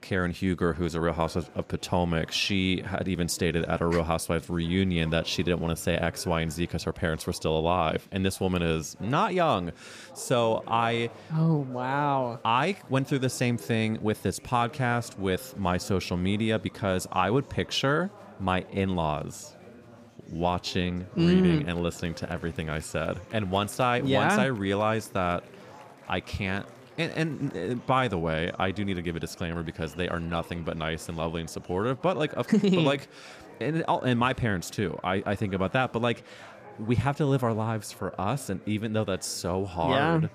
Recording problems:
chatter from many people; faint; throughout; 20 dB below the speech

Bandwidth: 15 kHz